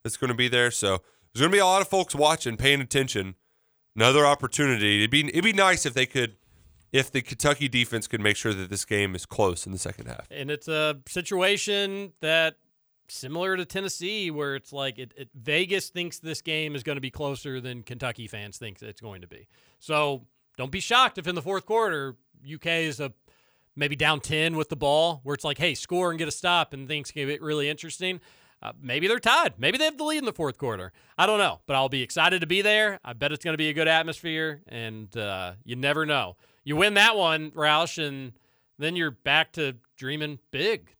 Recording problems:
none

